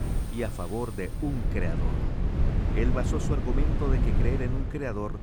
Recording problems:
wind noise on the microphone; heavy; 4 dB below the speech
animal sounds; noticeable; until 1 s; 15 dB below the speech
voice in the background; faint; throughout; 25 dB below the speech

